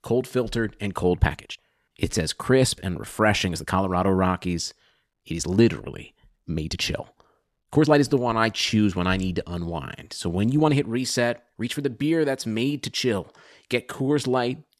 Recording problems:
uneven, jittery; strongly; from 1 to 14 s

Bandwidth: 13.5 kHz